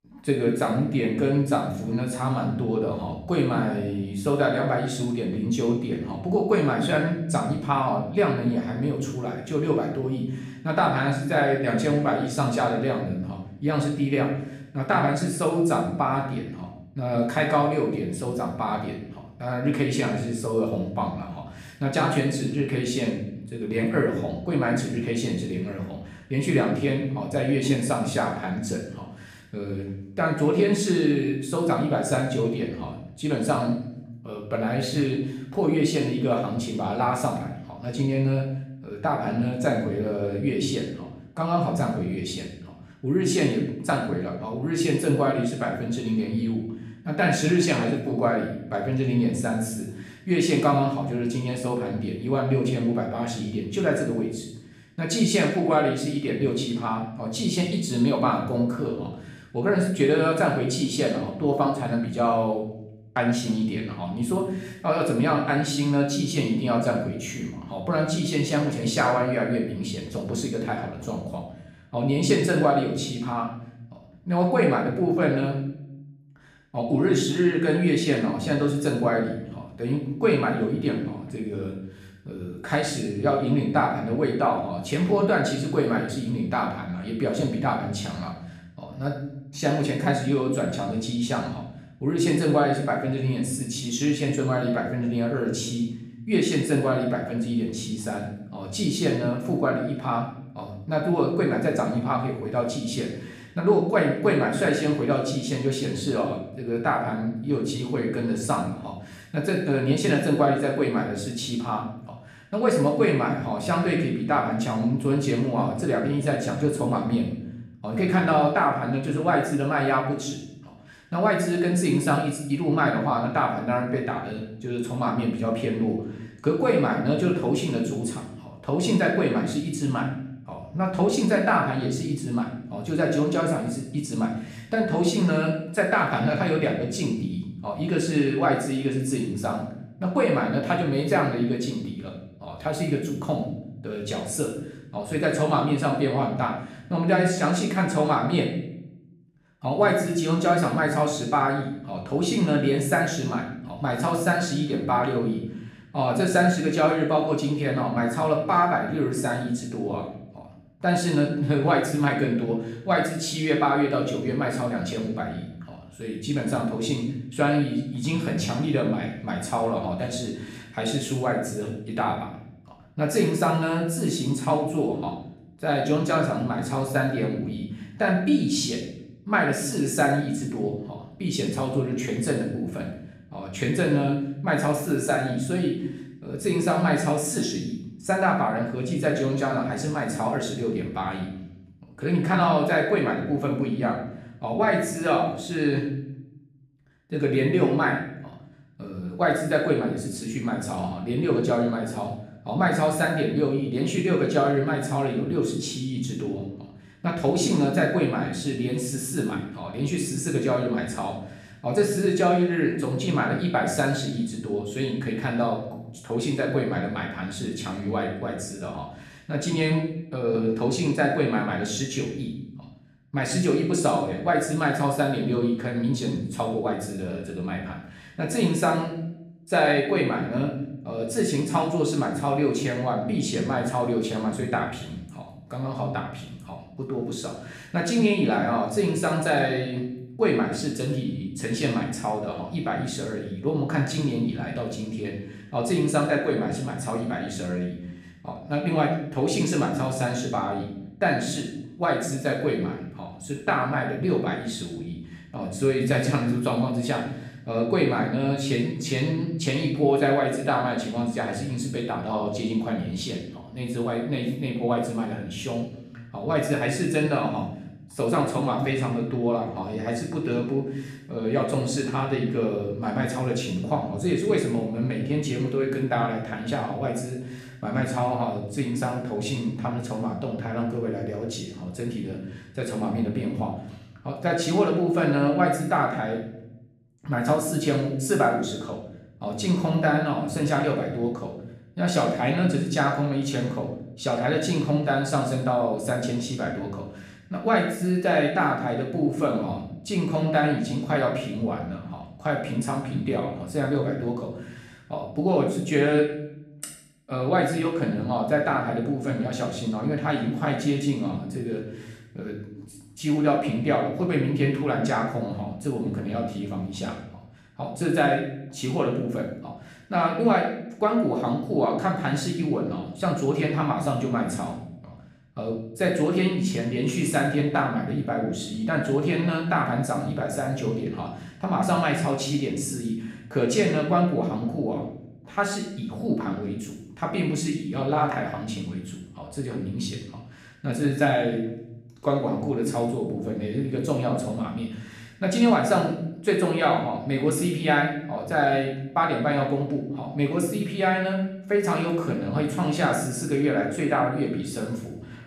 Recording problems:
off-mic speech; far
room echo; noticeable; dies away in 0.7 s

